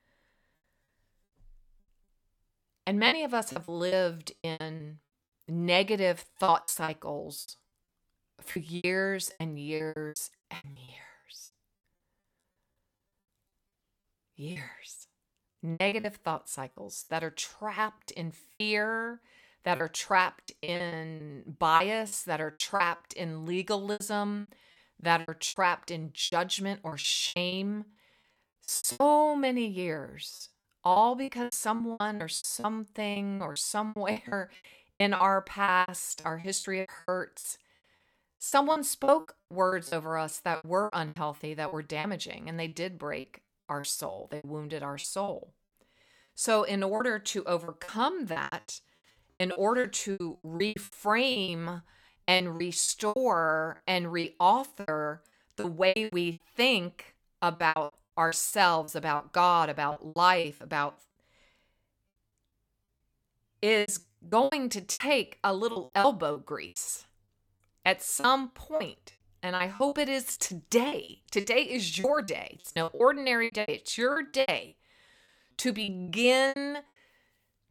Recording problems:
choppy; very; 15% of the speech affected

